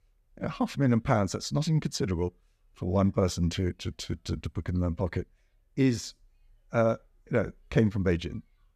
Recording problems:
none

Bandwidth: 14.5 kHz